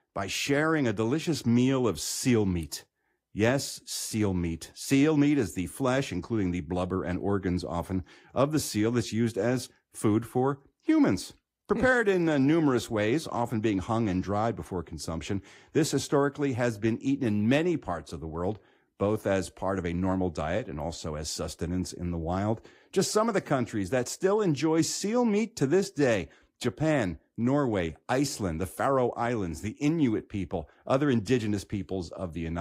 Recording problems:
garbled, watery; slightly; nothing above 15.5 kHz
abrupt cut into speech; at the end

